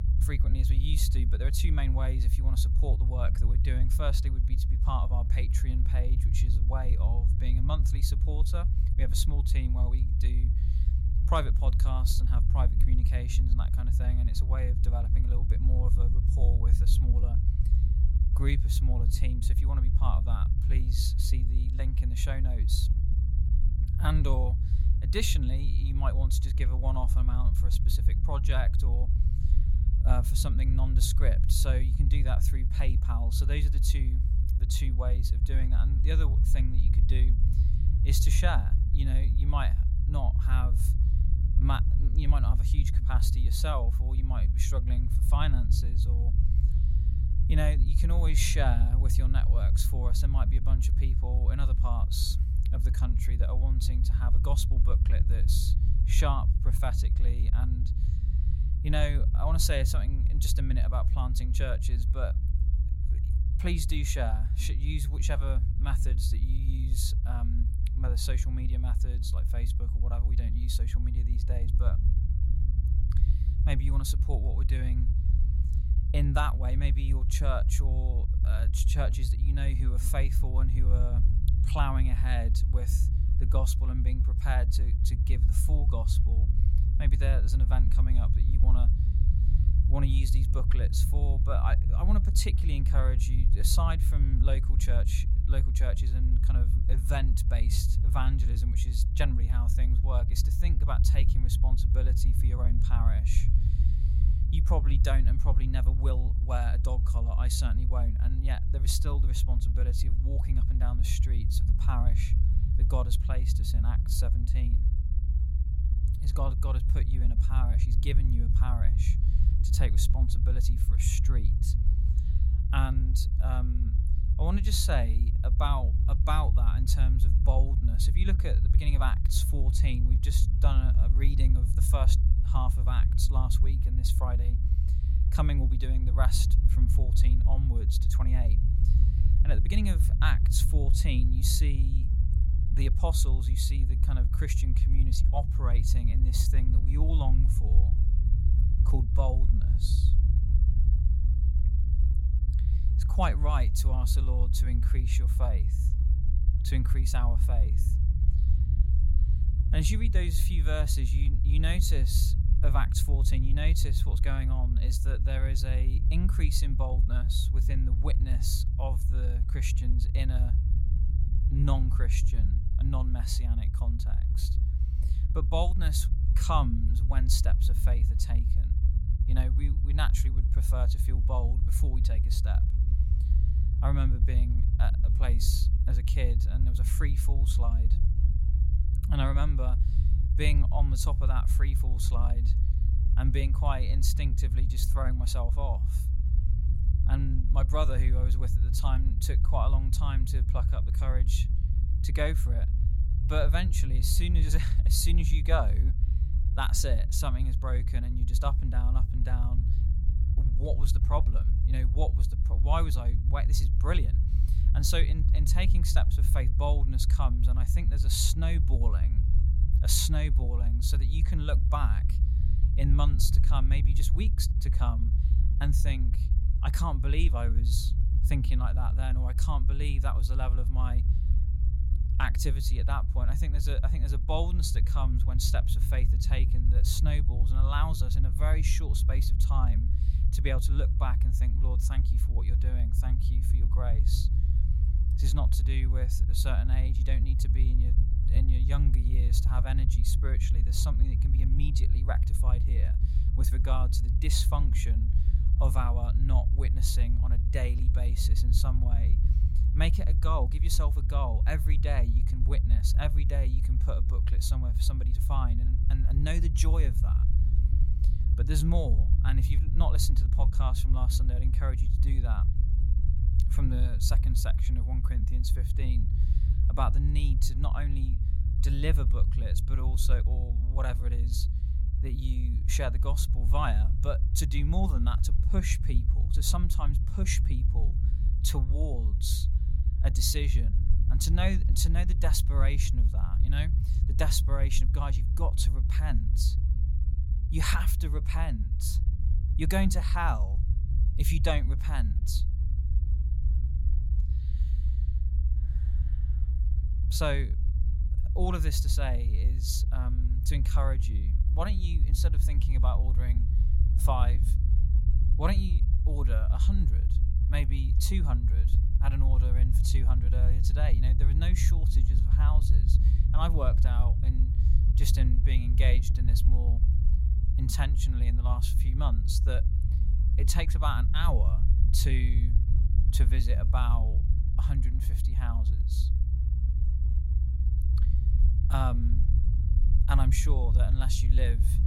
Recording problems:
low rumble; loud; throughout; 8 dB below the speech

